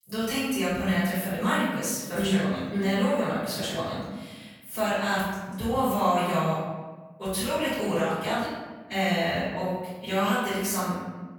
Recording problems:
room echo; strong; dies away in 1.2 s
off-mic speech; far

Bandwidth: 18 kHz